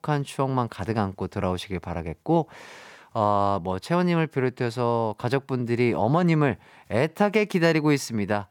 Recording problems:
none

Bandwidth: 18 kHz